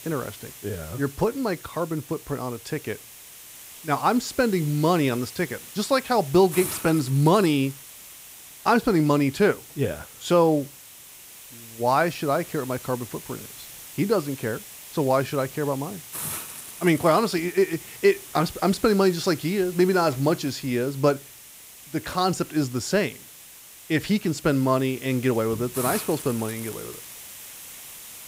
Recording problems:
hiss; noticeable; throughout; 15 dB below the speech

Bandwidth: 15.5 kHz